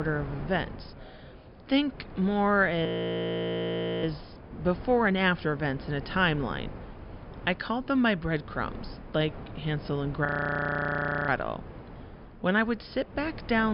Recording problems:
high frequencies cut off; noticeable; nothing above 5.5 kHz
wind noise on the microphone; occasional gusts; 20 dB below the speech
voice in the background; faint; throughout; 30 dB below the speech
abrupt cut into speech; at the start and the end
audio freezing; at 3 s for 1 s and at 10 s for 1 s

